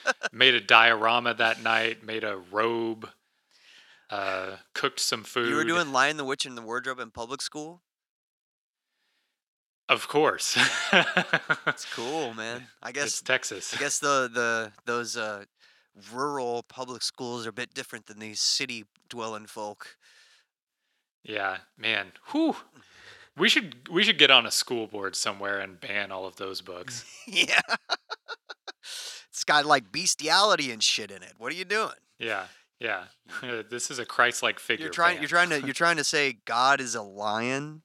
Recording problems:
thin; very; fading below 400 Hz

